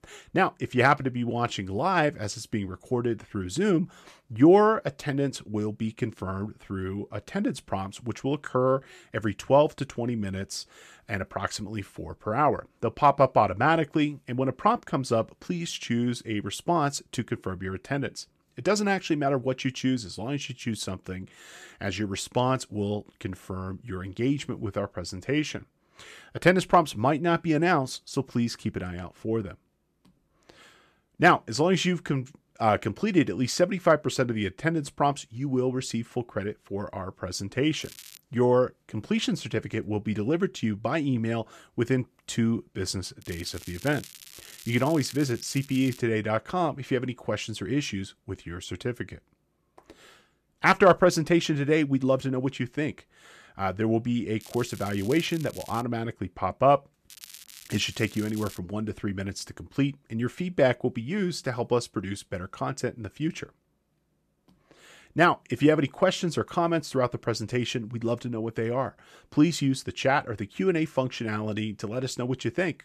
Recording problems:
crackling; noticeable; 4 times, first at 38 s; 20 dB below the speech

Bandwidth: 14.5 kHz